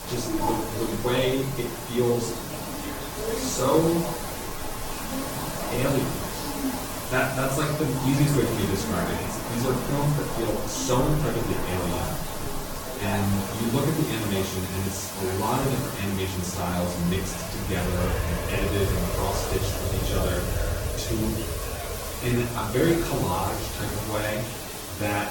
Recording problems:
off-mic speech; far
room echo; noticeable; dies away in 0.5 s
garbled, watery; slightly; nothing above 17 kHz
train or aircraft noise; loud; throughout; 6 dB below the speech
hiss; loud; throughout; 8 dB below the speech
background chatter; noticeable; throughout; 3 voices, 15 dB below the speech

